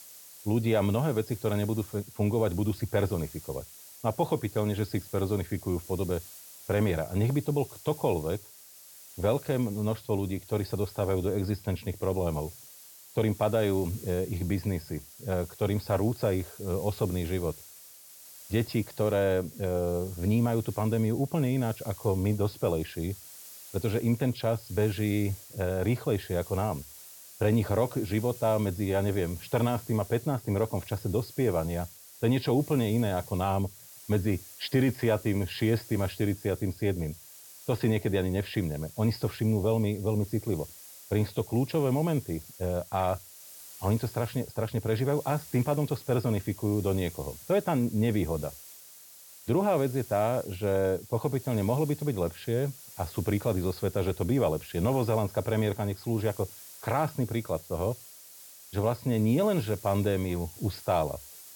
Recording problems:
high frequencies cut off; noticeable; nothing above 5.5 kHz
hiss; noticeable; throughout; 15 dB below the speech

